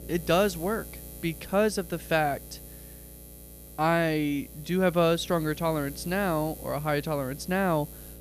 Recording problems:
electrical hum; faint; throughout; 60 Hz, 20 dB below the speech

